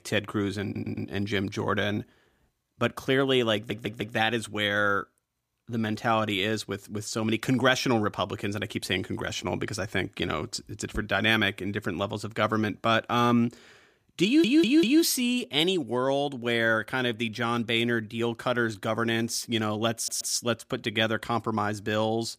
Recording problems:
audio stuttering; 4 times, first at 0.5 s

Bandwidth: 15 kHz